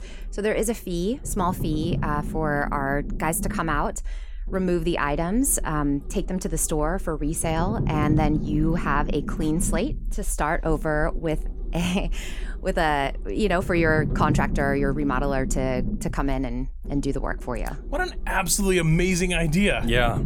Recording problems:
low rumble; noticeable; throughout; 15 dB below the speech

